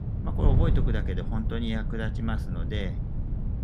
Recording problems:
wind noise on the microphone; heavy; 5 dB below the speech

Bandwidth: 14.5 kHz